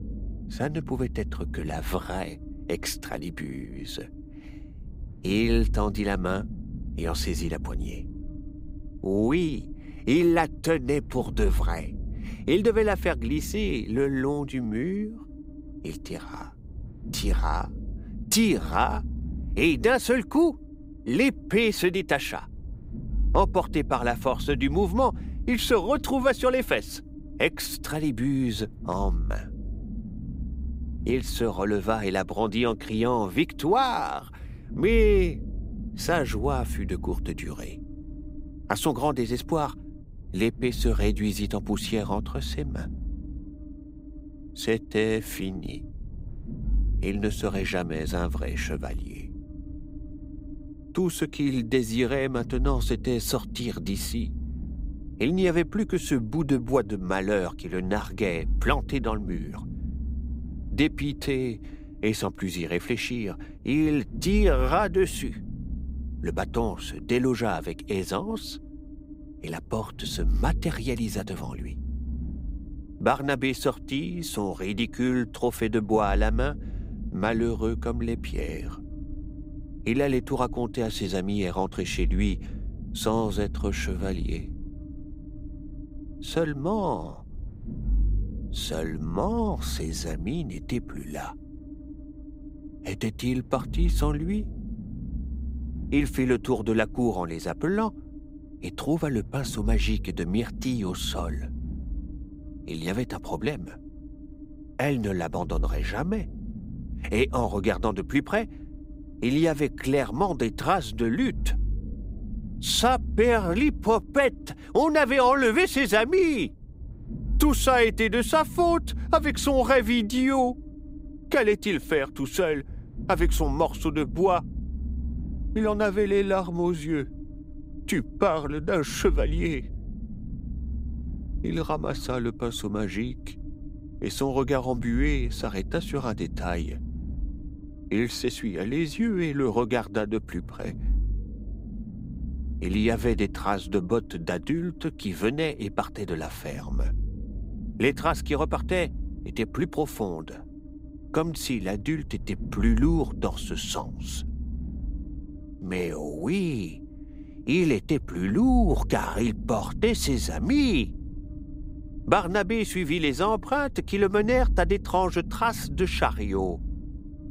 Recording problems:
low rumble; faint; throughout; 20 dB below the speech

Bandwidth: 15.5 kHz